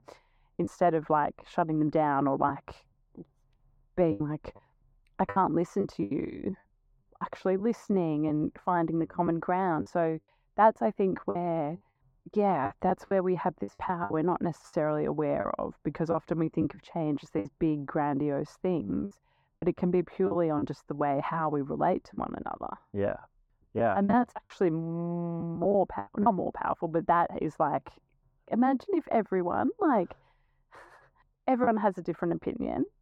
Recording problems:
muffled; very; fading above 2.5 kHz
choppy; very; 6% of the speech affected

